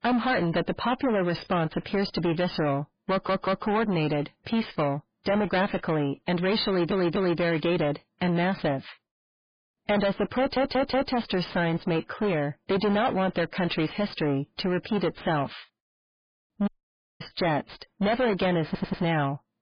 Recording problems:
distortion; heavy; 5 dB below the speech
garbled, watery; badly
audio stuttering; 4 times, first at 3 s
audio cutting out; at 17 s for 0.5 s

